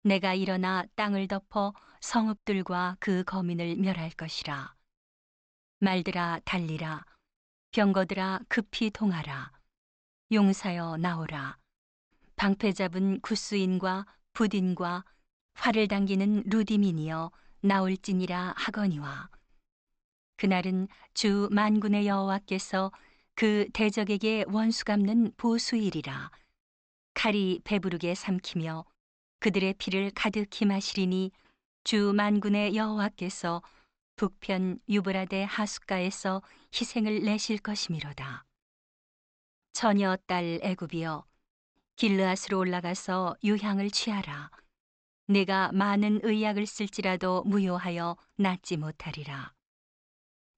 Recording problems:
high frequencies cut off; noticeable; nothing above 8 kHz

